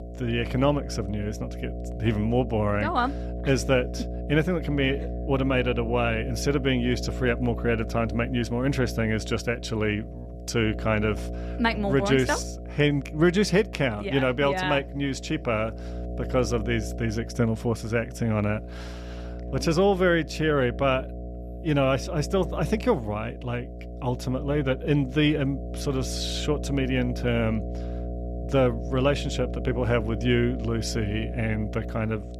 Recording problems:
electrical hum; noticeable; throughout; 60 Hz, 15 dB below the speech

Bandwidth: 14.5 kHz